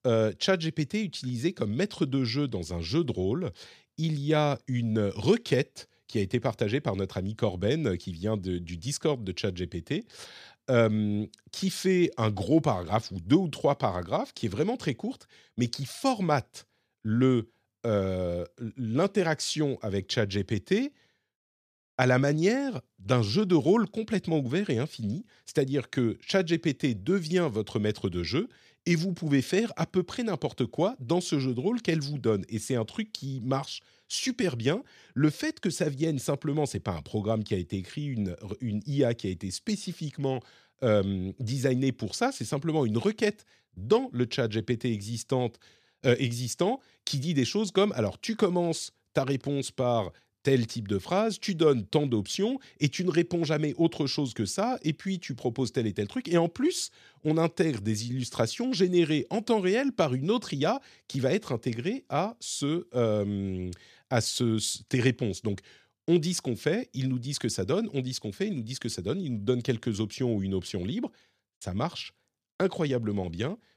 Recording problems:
none

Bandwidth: 14.5 kHz